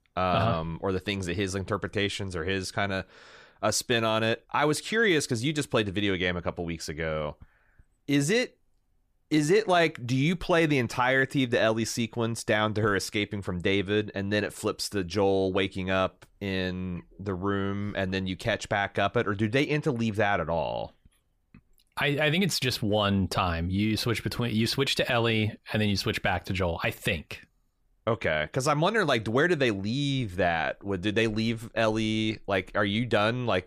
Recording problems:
none

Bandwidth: 15 kHz